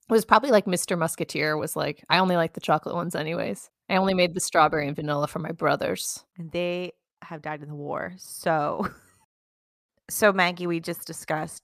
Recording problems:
none

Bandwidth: 15 kHz